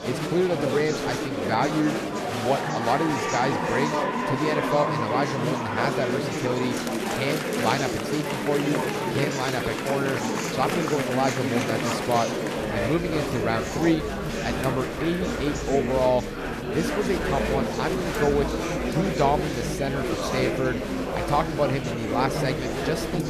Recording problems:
murmuring crowd; very loud; throughout; as loud as the speech

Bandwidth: 14 kHz